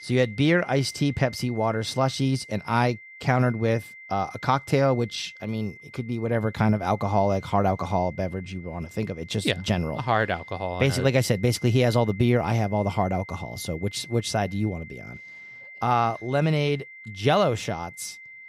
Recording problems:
high-pitched whine; noticeable; throughout; 2 kHz, 20 dB below the speech

